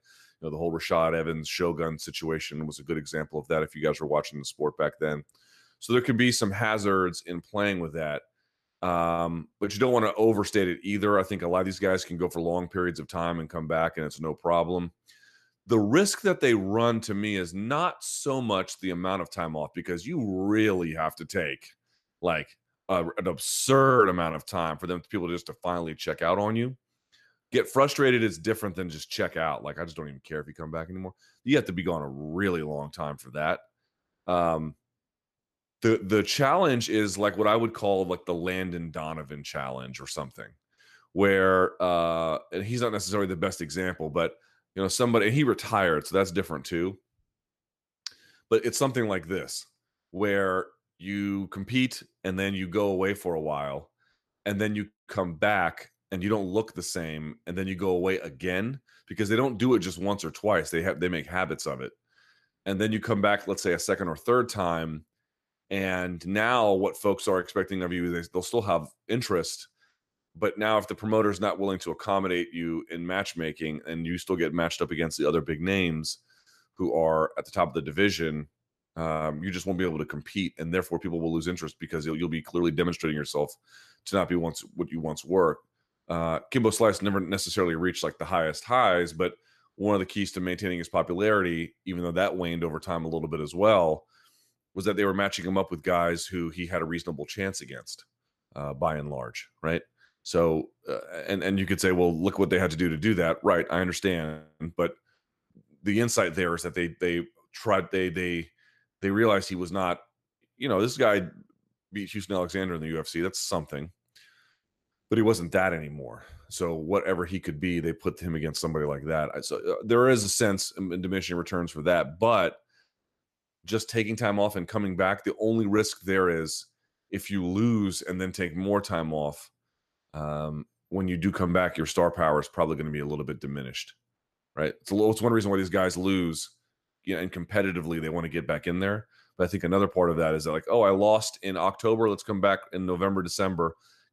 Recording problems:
none

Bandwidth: 13.5 kHz